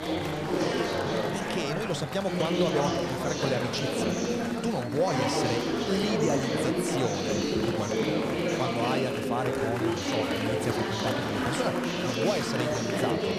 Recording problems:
chatter from many people; very loud; throughout; 4 dB above the speech

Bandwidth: 14.5 kHz